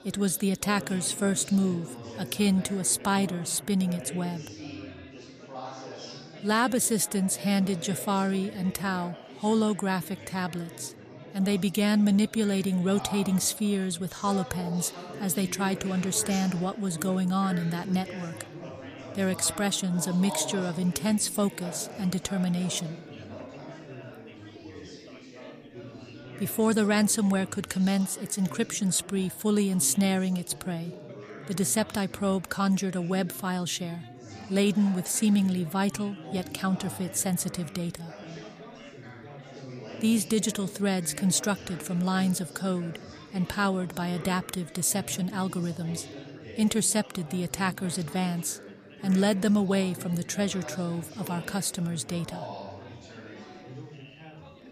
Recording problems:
chatter from many people; noticeable; throughout; 15 dB below the speech

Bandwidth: 14.5 kHz